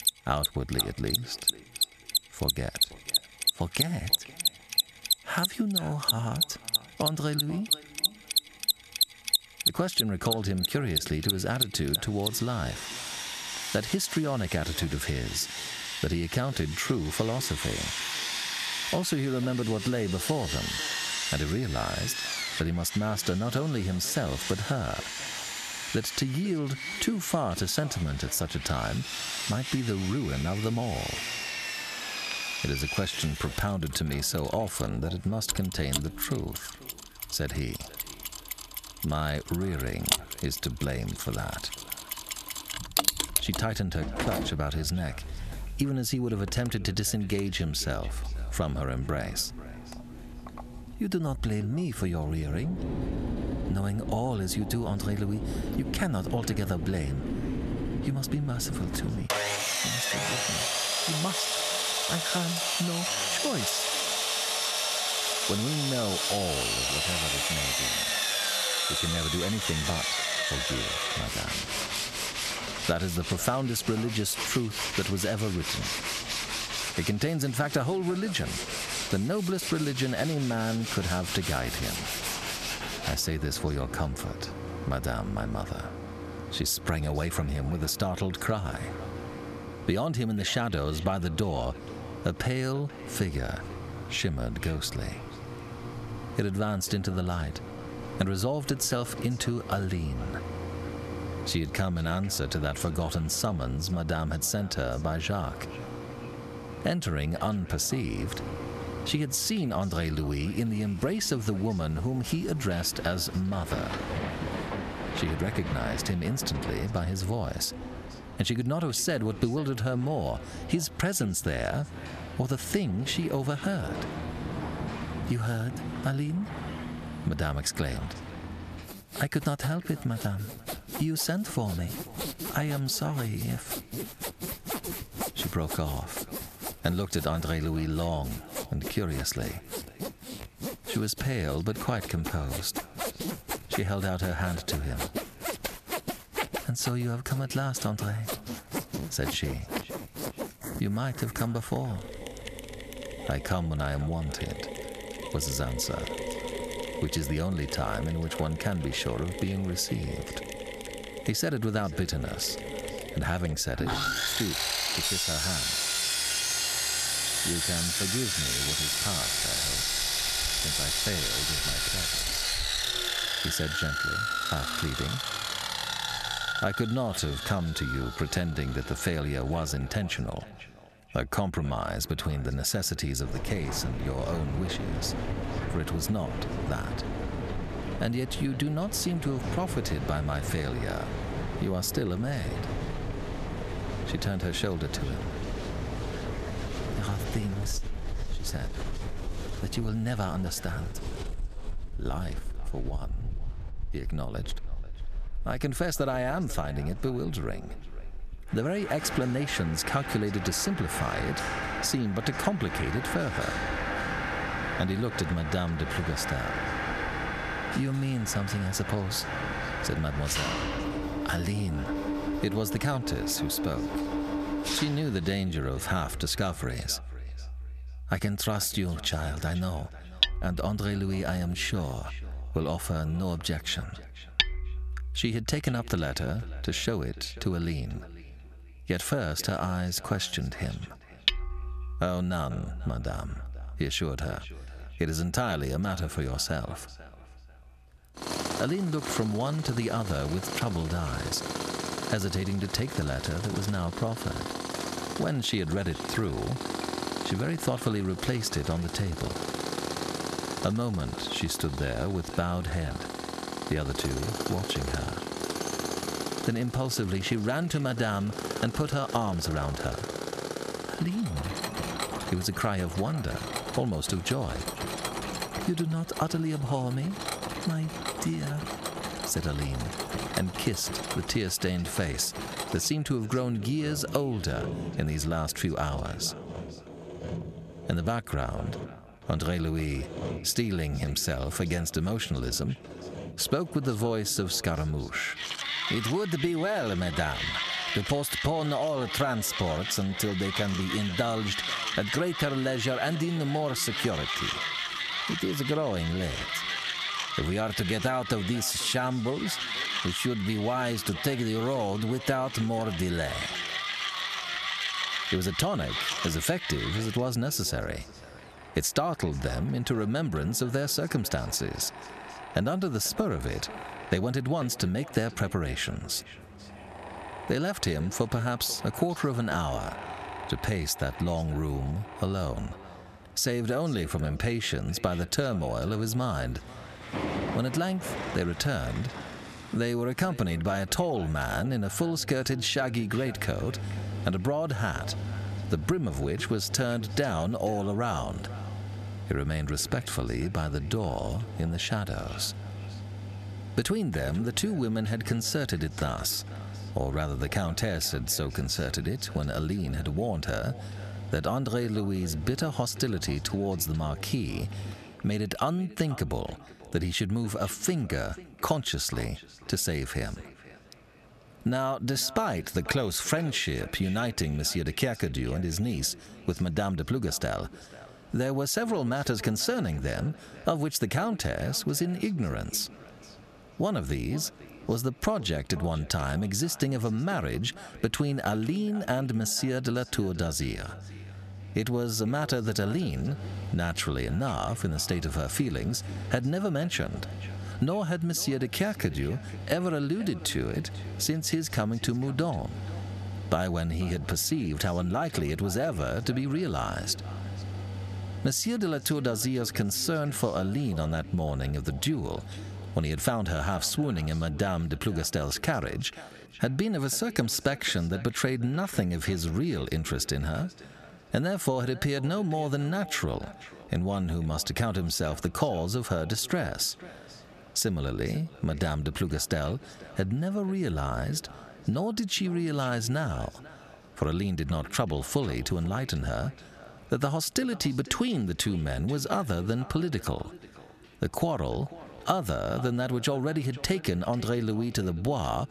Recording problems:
squashed, flat; heavily, background pumping
echo of what is said; faint; throughout; 490 ms later, 20 dB below the speech
machinery noise; loud; throughout; 3 dB below the speech

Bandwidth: 14 kHz